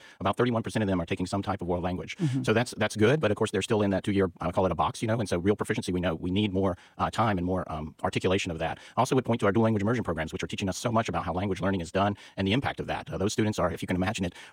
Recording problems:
wrong speed, natural pitch; too fast; 1.6 times normal speed

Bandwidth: 16 kHz